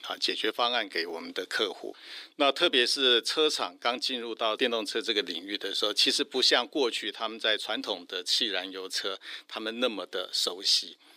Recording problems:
thin; somewhat; fading below 350 Hz

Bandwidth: 15.5 kHz